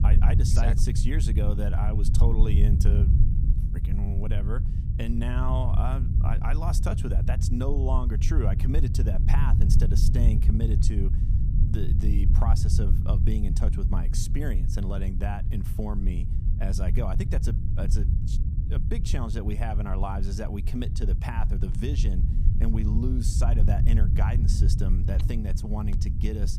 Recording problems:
low rumble; loud; throughout; 4 dB below the speech

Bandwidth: 15 kHz